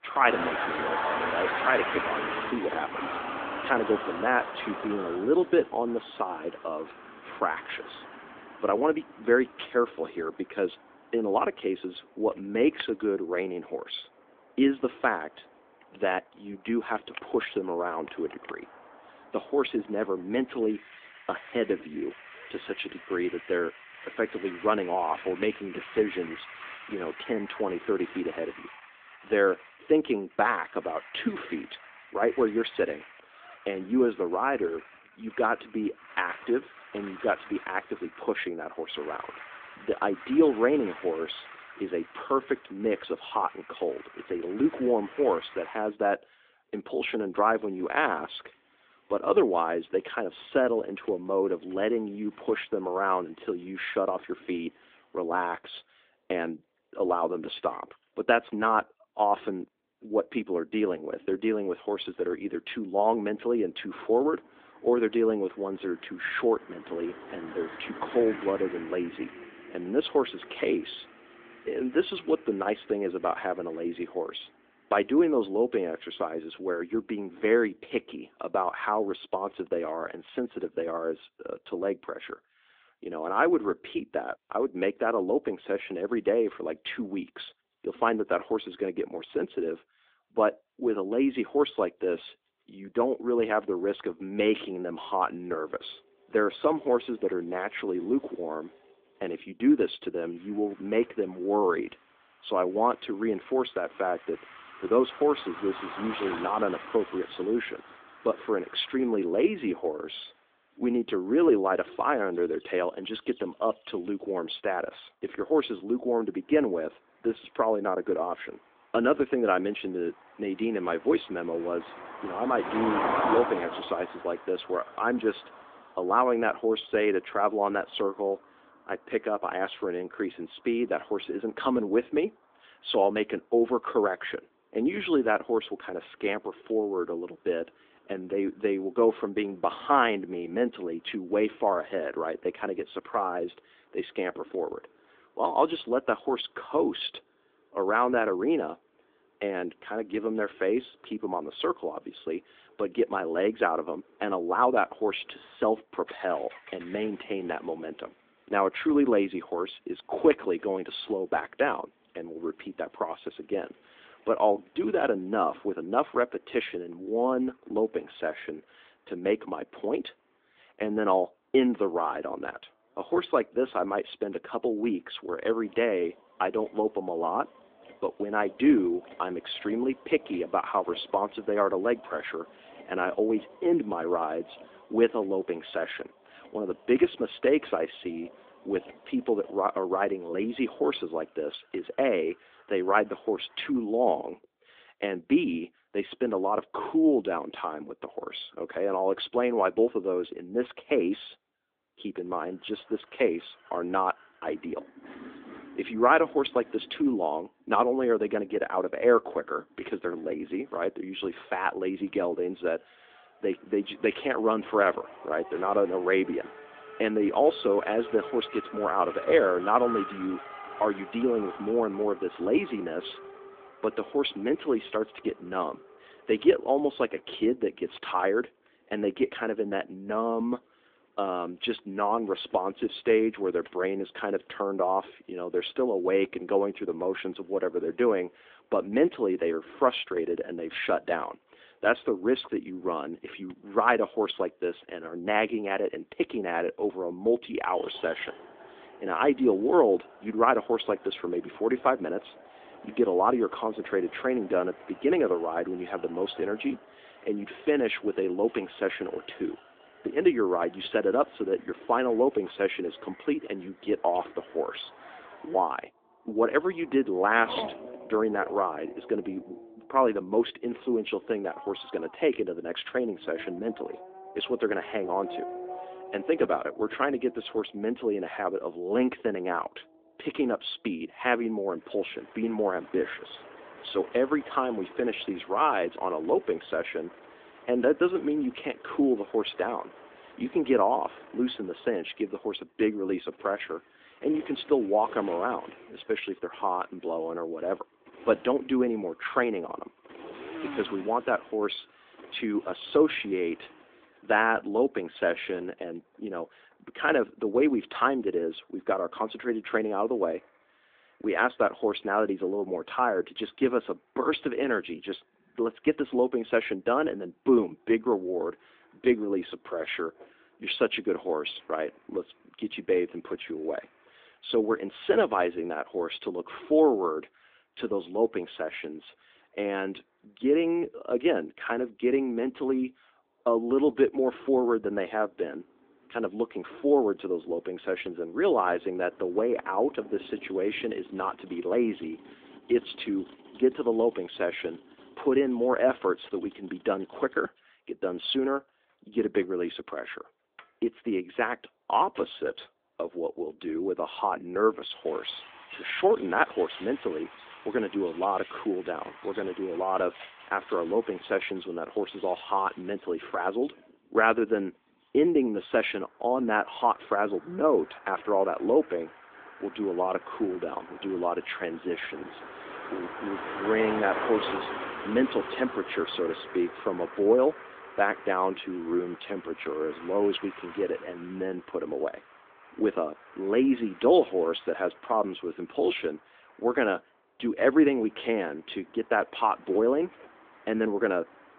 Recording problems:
phone-call audio
traffic noise; noticeable; throughout; 15 dB below the speech

